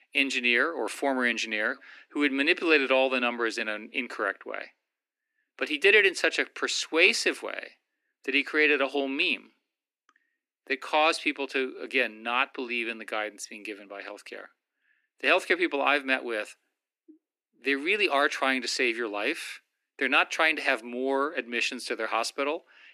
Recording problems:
thin; somewhat; fading below 250 Hz

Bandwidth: 14.5 kHz